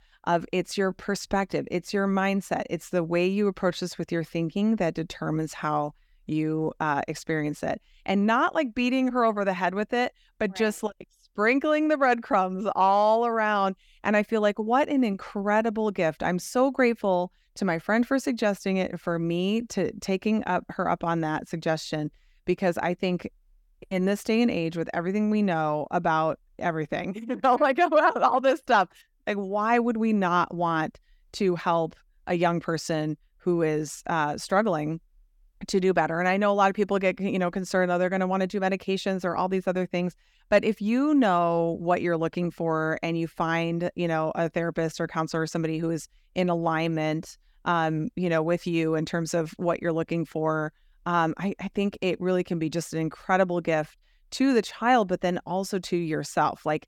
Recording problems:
none

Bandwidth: 17.5 kHz